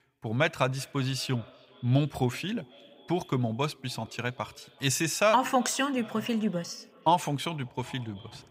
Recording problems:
echo of what is said; faint; throughout; 380 ms later, 25 dB below the speech

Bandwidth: 15.5 kHz